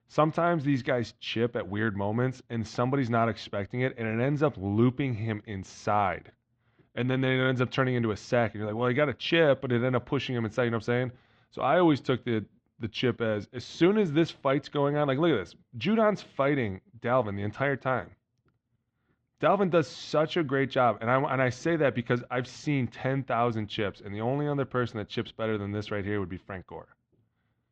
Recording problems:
muffled; slightly; fading above 4 kHz

